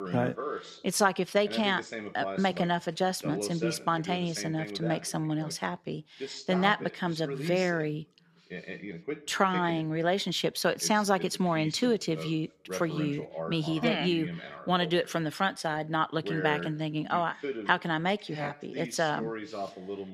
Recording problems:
voice in the background; loud; throughout; 10 dB below the speech

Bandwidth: 14 kHz